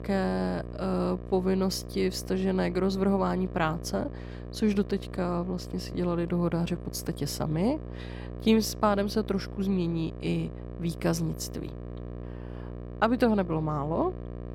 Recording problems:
electrical hum; noticeable; throughout; 60 Hz, 15 dB below the speech

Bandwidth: 16.5 kHz